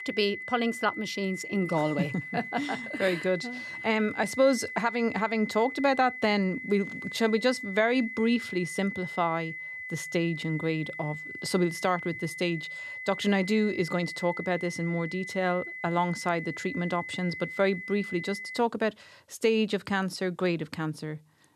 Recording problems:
high-pitched whine; loud; until 19 s; 2 kHz, 8 dB below the speech

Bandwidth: 13.5 kHz